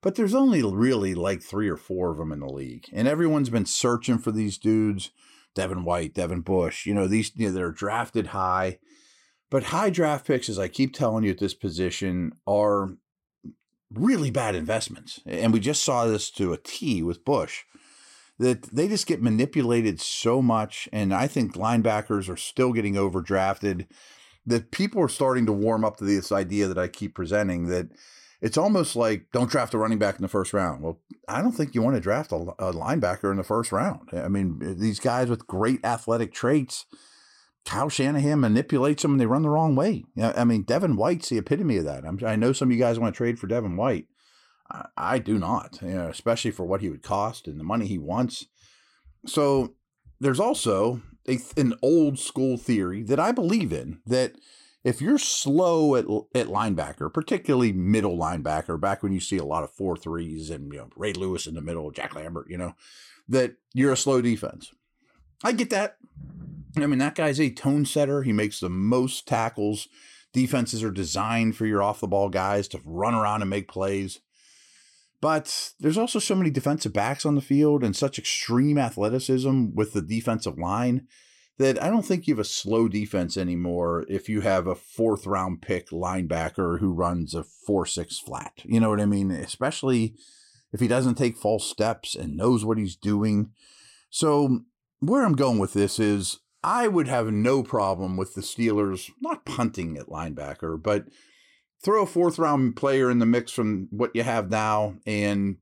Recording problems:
none

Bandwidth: 16 kHz